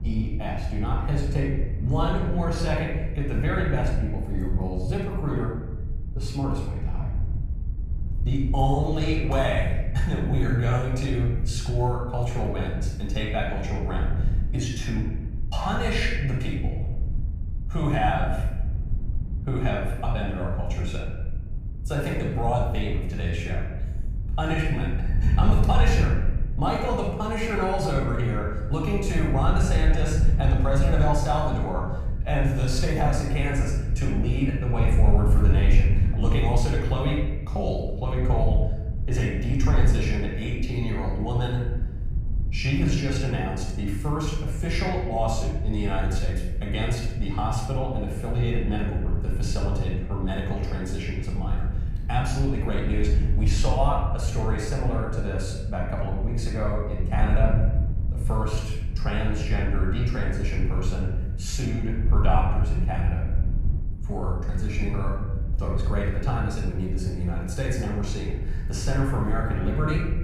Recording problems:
off-mic speech; far
room echo; noticeable; dies away in 1.1 s
wind noise on the microphone; occasional gusts; 15 dB below the speech

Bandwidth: 15 kHz